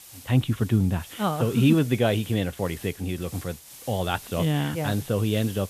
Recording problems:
high frequencies cut off; severe; nothing above 4 kHz
hiss; noticeable; throughout; 15 dB below the speech

